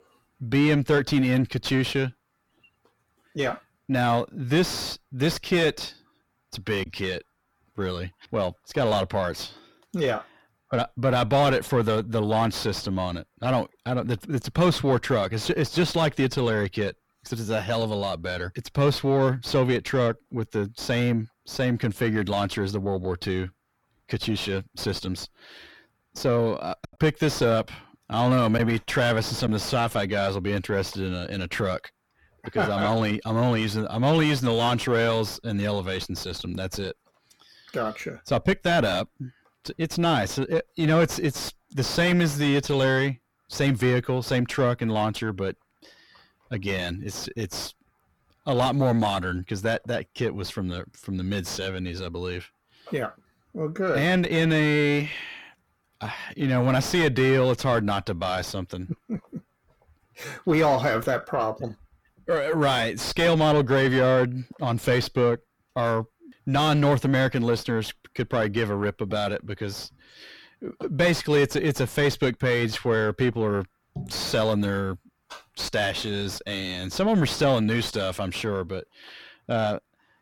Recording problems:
distortion; heavy; 5 dB below the speech
choppy; occasionally; at 7 s and from 27 to 29 s; 2% of the speech affected

